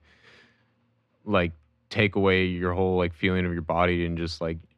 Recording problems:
muffled; very; fading above 2 kHz

